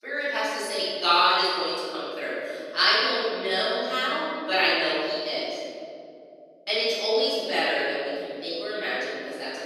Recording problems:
room echo; strong; dies away in 3 s
off-mic speech; far
thin; very slightly; fading below 250 Hz

